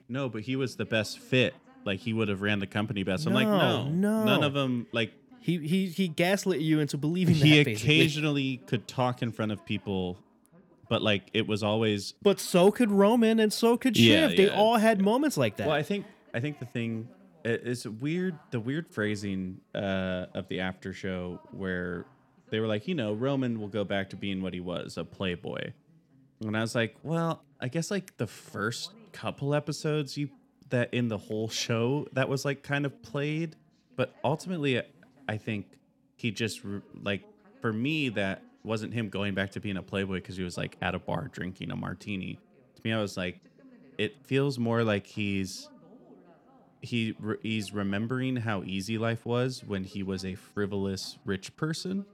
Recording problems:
voice in the background; faint; throughout; 30 dB below the speech

